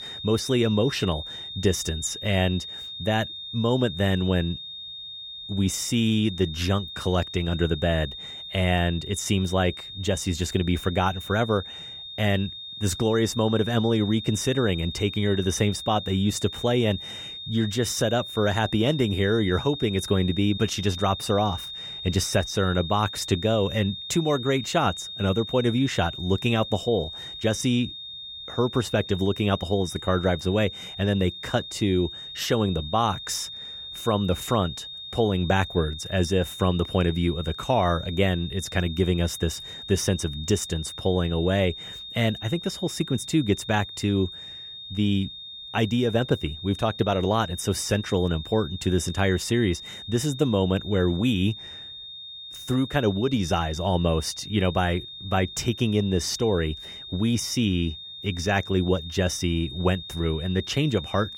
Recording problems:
high-pitched whine; noticeable; throughout; 3.5 kHz, 10 dB below the speech

